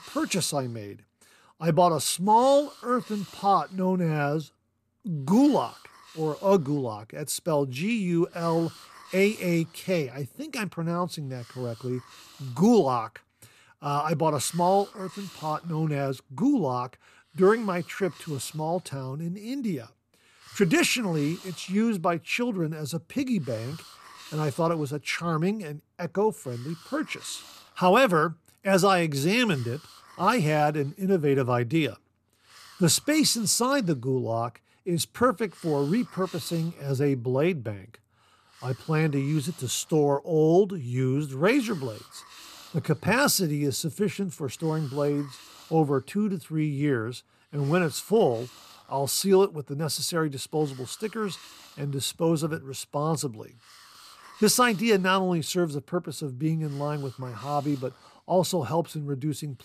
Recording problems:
hiss; faint; throughout; 20 dB below the speech

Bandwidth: 14.5 kHz